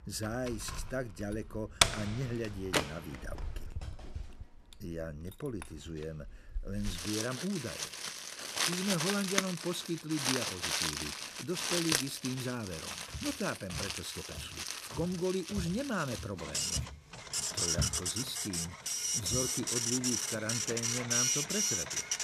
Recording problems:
household noises; very loud; throughout; 5 dB above the speech
footsteps; loud; from 13 to 19 s; peak 1 dB above the speech

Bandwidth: 14 kHz